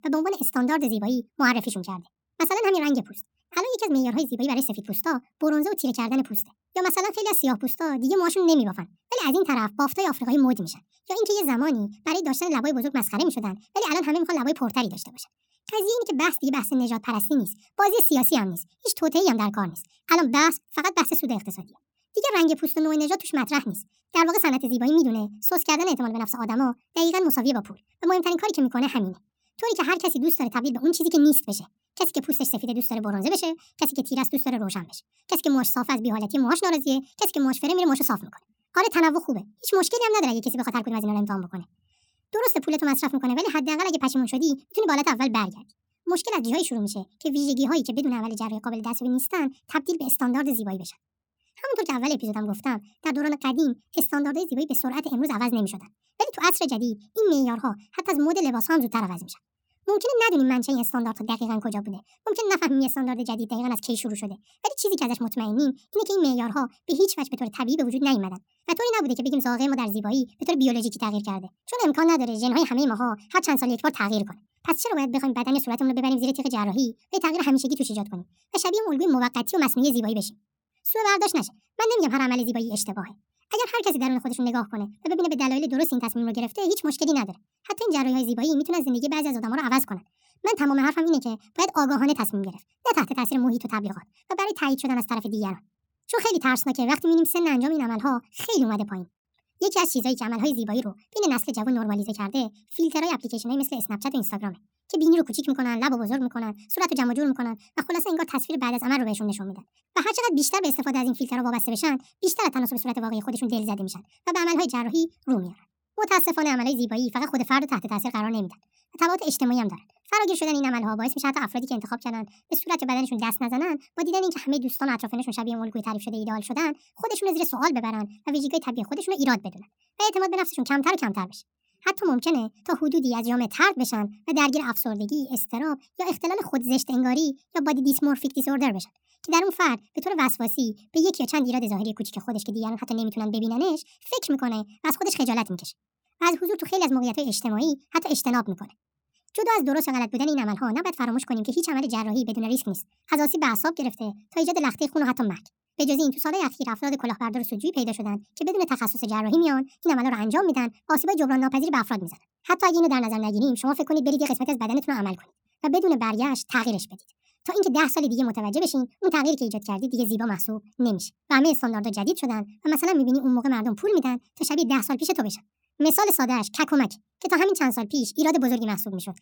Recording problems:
wrong speed and pitch; too fast and too high; 1.5 times normal speed

